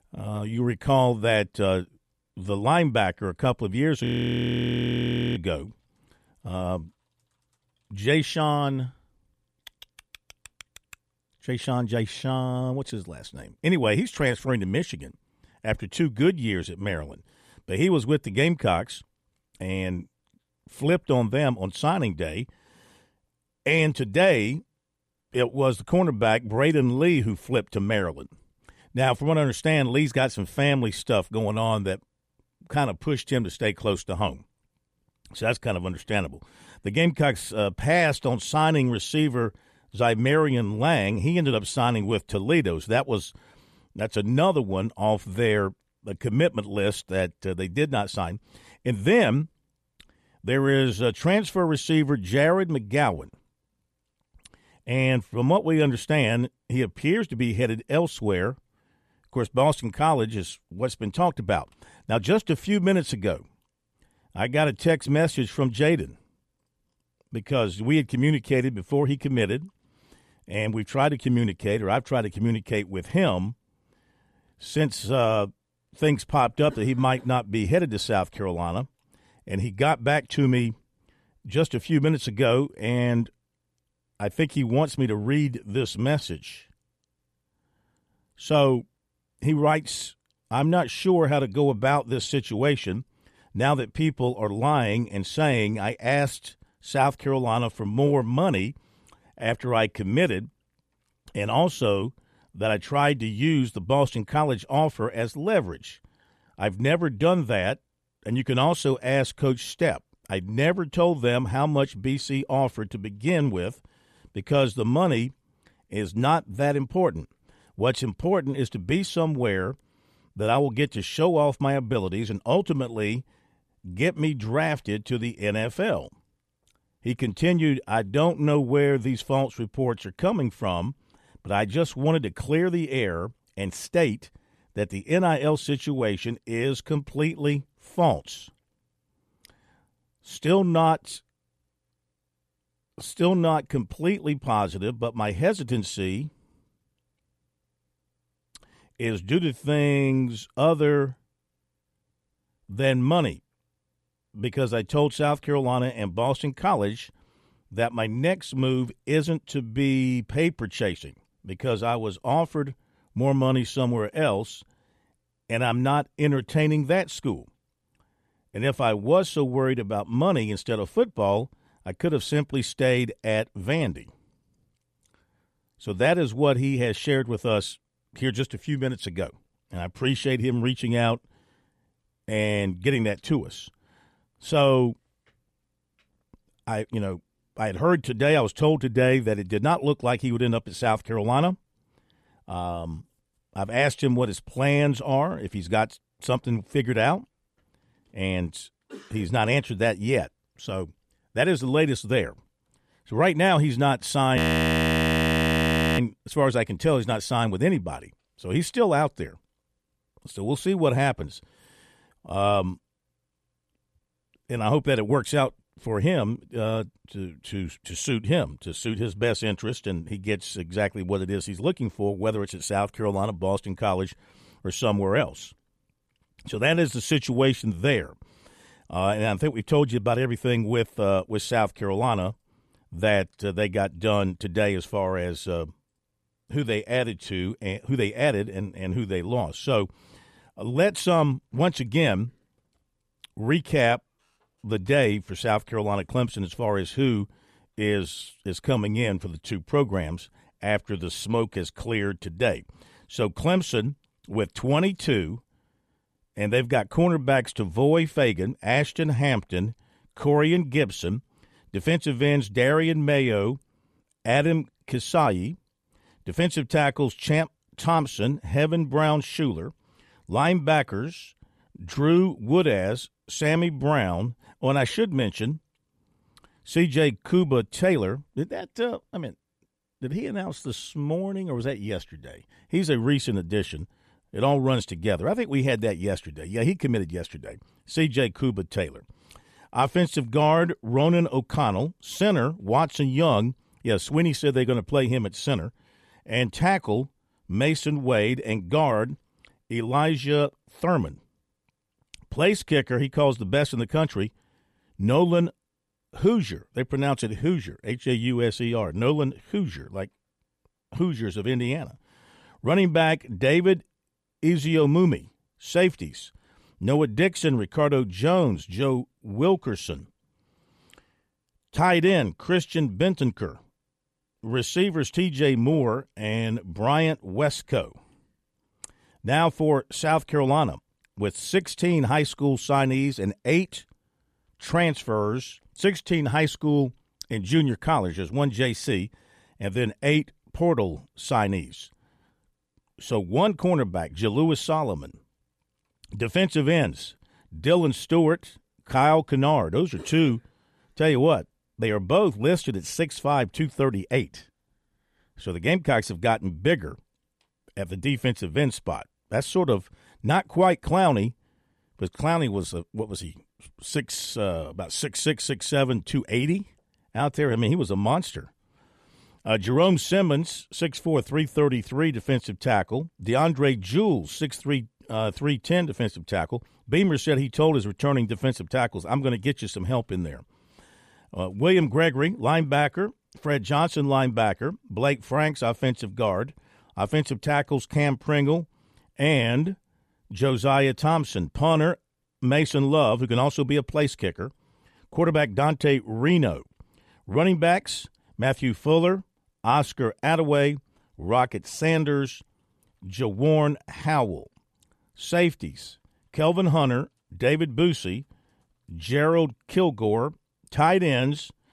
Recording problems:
audio freezing; at 4 s for 1.5 s and at 3:24 for 1.5 s

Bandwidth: 14.5 kHz